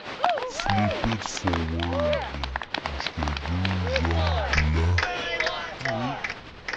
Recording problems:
wrong speed and pitch; too slow and too low; 0.6 times normal speed
crowd noise; very loud; throughout; 1 dB above the speech
rain or running water; faint; from 2.5 s on; 20 dB below the speech

